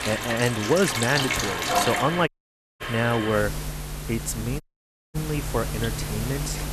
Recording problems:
household noises; loud; throughout; 2 dB below the speech
audio cutting out; at 2.5 s for 0.5 s and at 4.5 s for 0.5 s

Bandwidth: 13.5 kHz